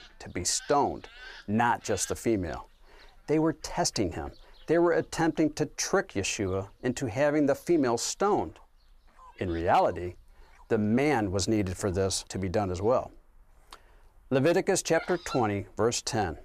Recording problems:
animal sounds; faint; throughout; 20 dB below the speech

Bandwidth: 15 kHz